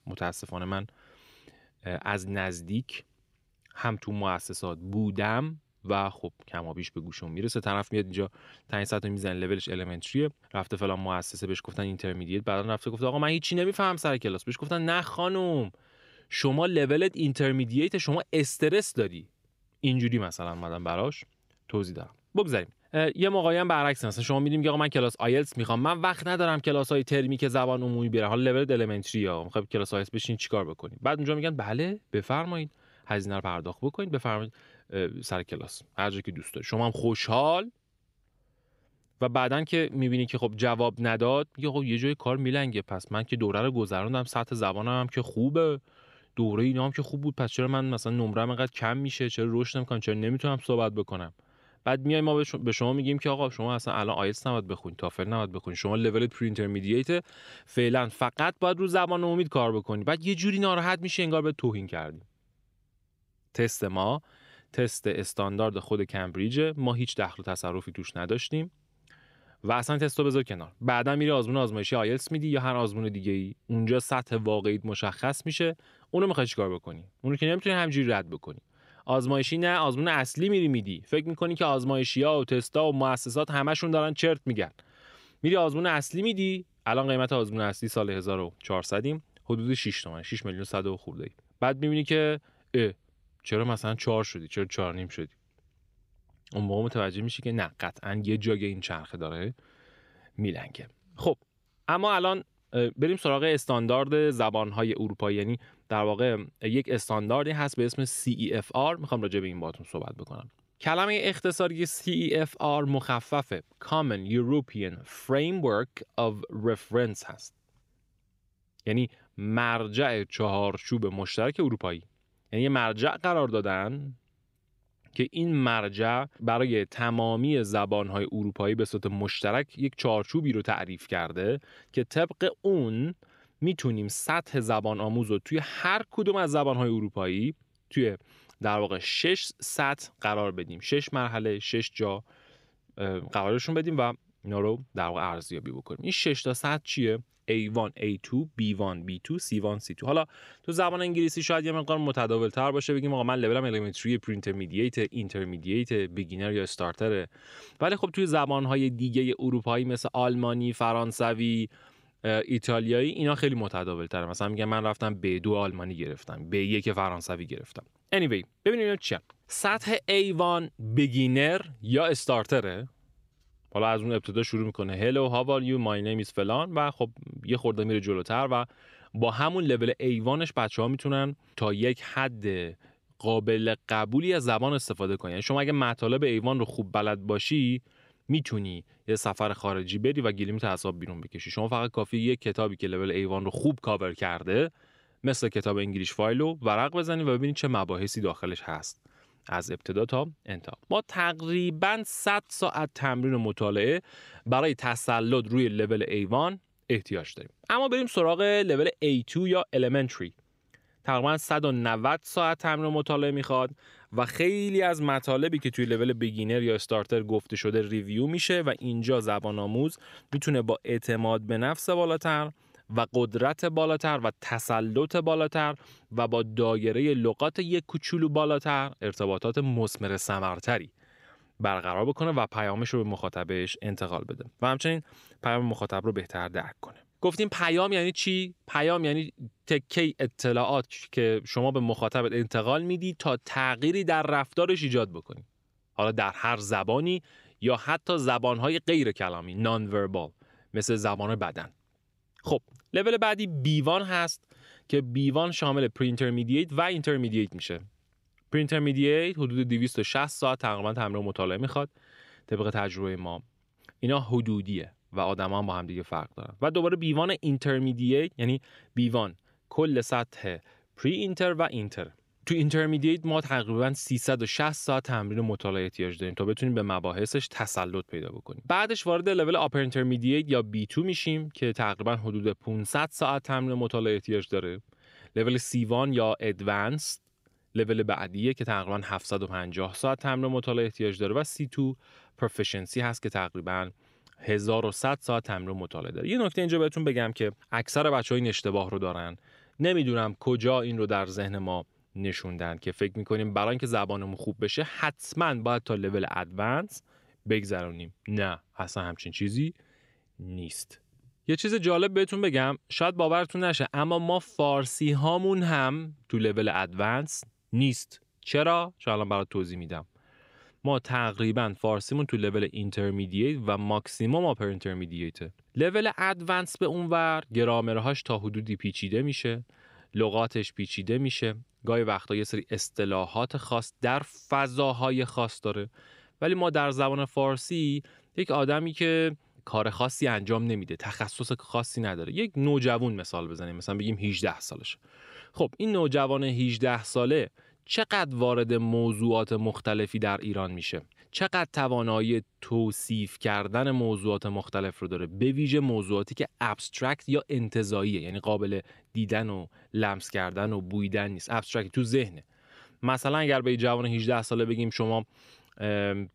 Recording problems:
none

